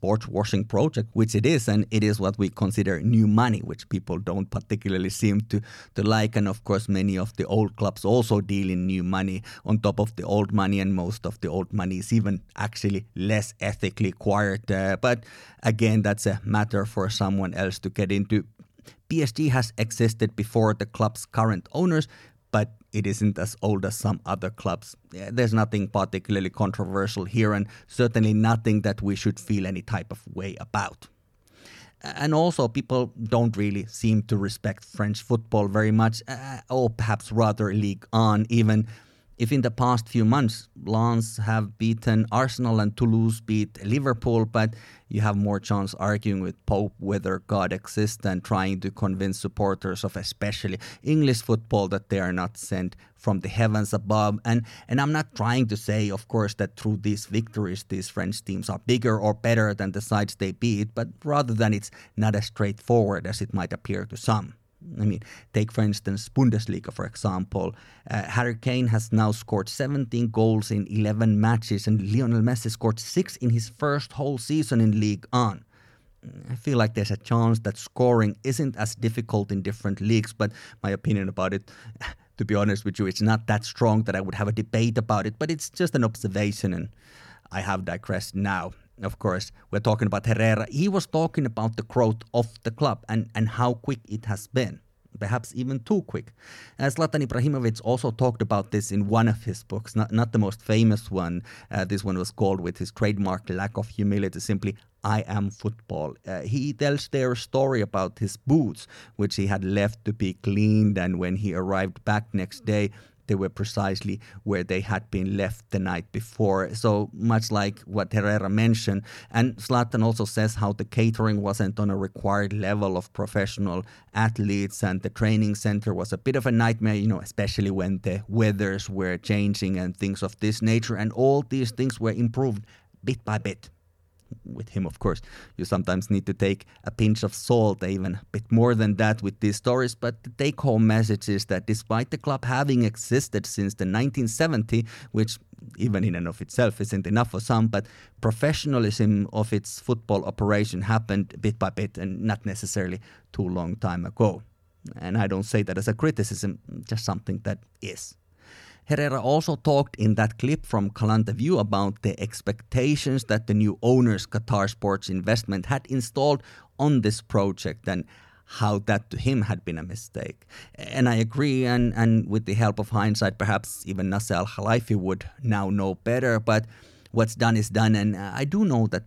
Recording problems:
none

